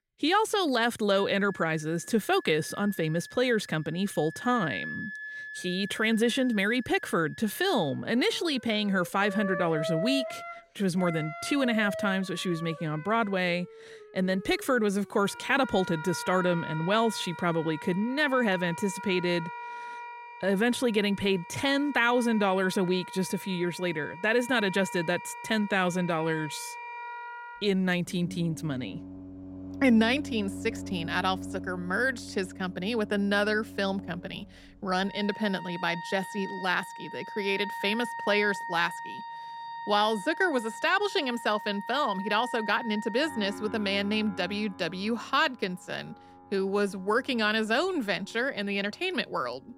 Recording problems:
background music; noticeable; throughout; 10 dB below the speech

